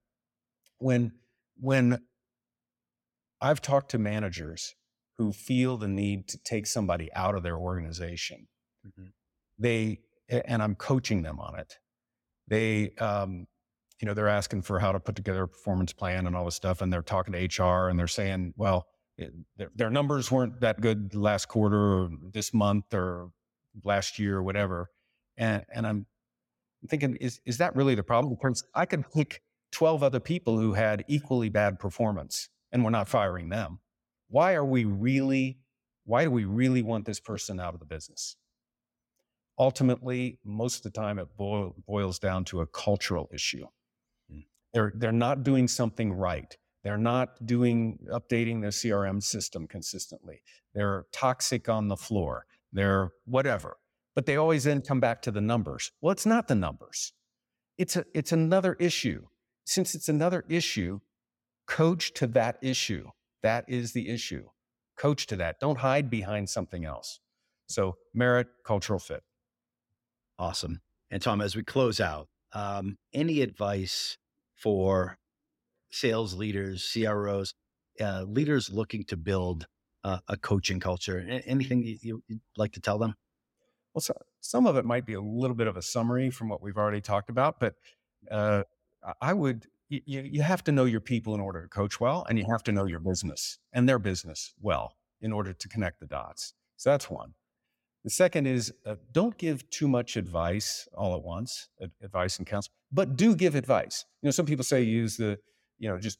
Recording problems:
none

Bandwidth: 16.5 kHz